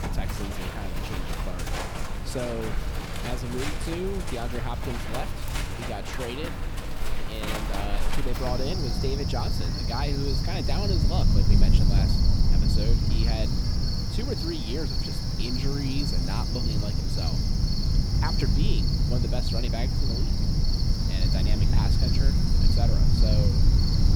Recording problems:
animal sounds; very loud; throughout; 4 dB above the speech
low rumble; loud; throughout; 6 dB below the speech

